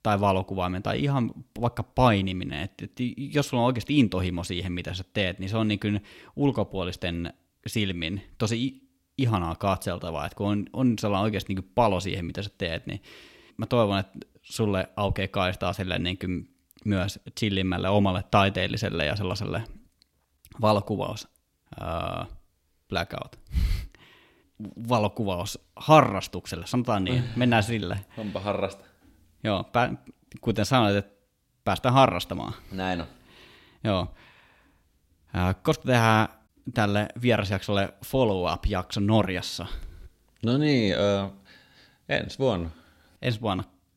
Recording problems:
none

